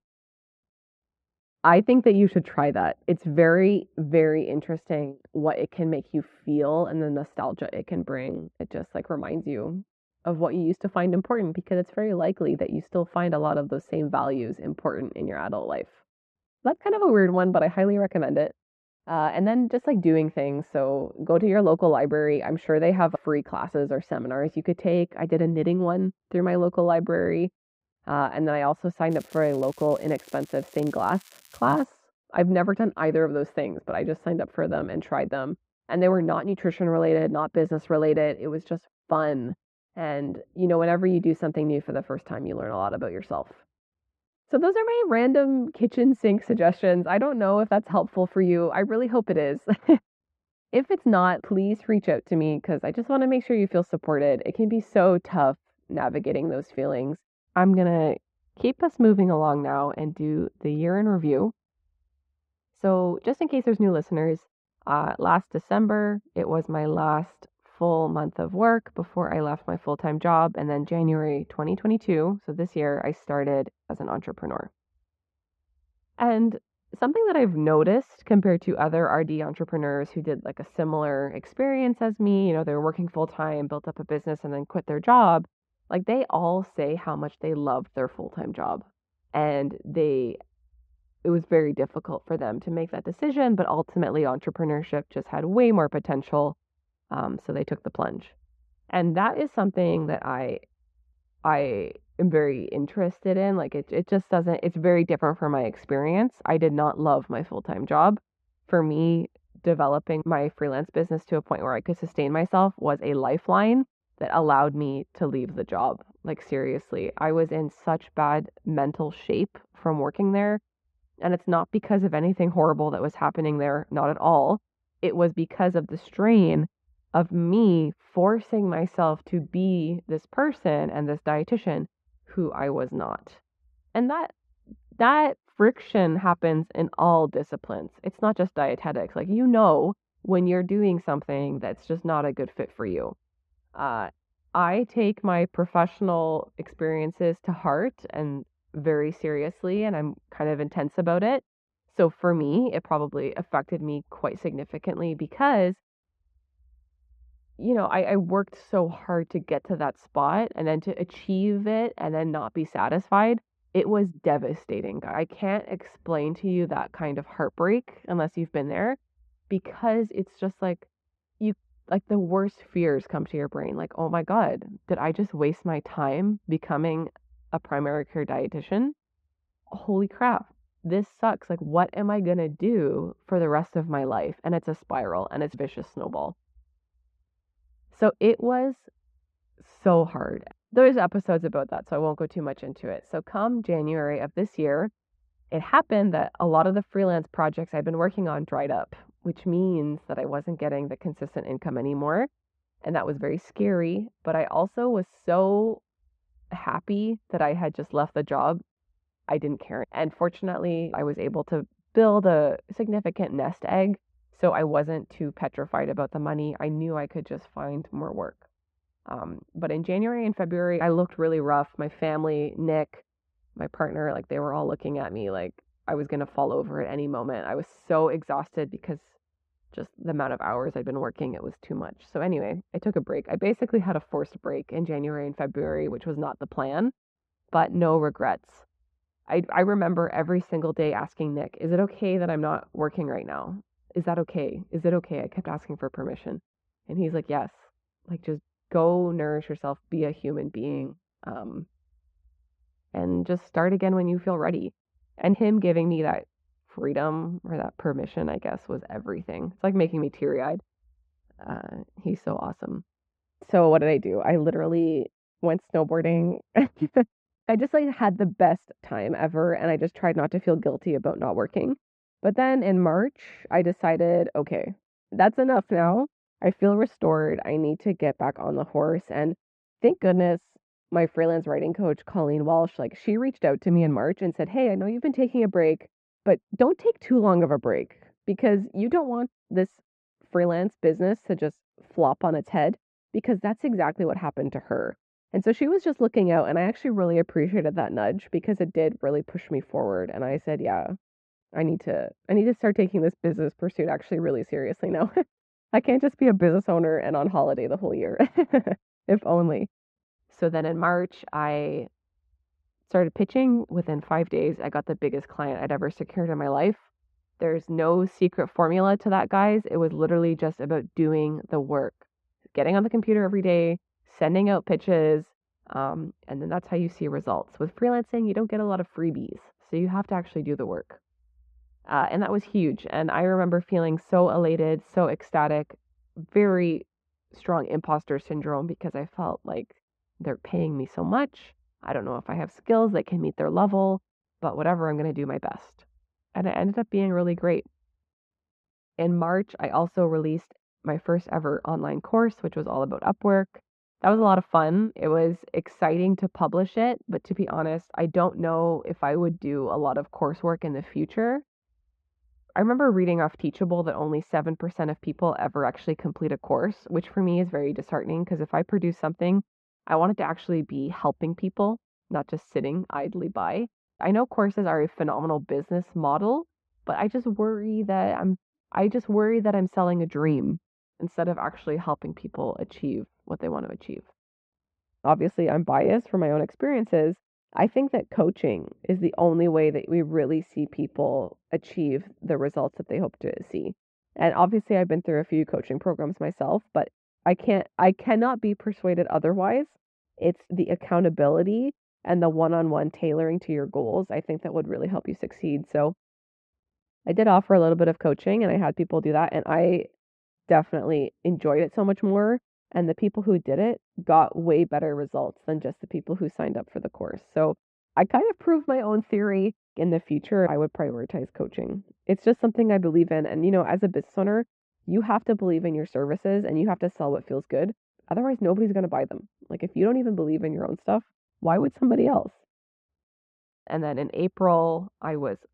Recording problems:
muffled; very; fading above 1 kHz
crackling; faint; from 29 to 32 s; 25 dB below the speech

